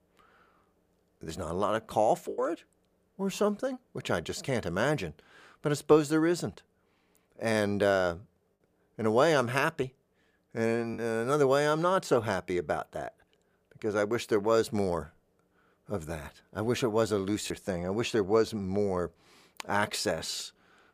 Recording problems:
choppy; occasionally; 1% of the speech affected

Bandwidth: 15 kHz